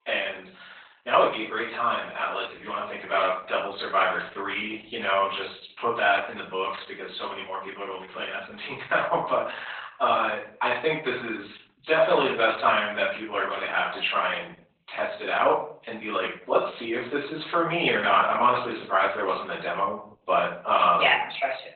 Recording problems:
off-mic speech; far
garbled, watery; badly; nothing above 4 kHz
thin; very; fading below 600 Hz
room echo; noticeable; dies away in 0.4 s
muffled; very slightly; fading above 3.5 kHz

